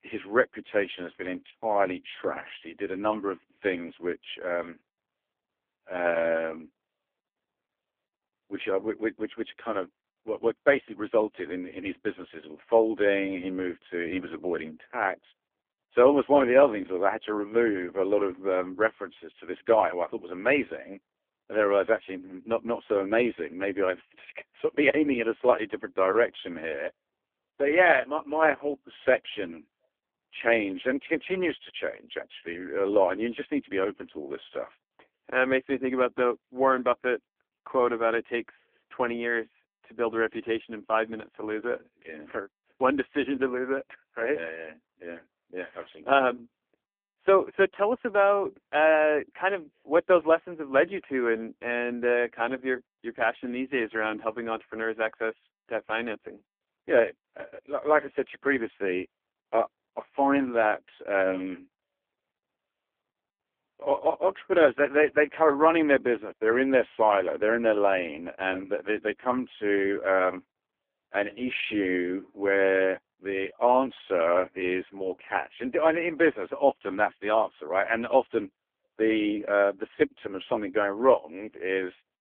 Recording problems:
phone-call audio; poor line; nothing above 3.5 kHz

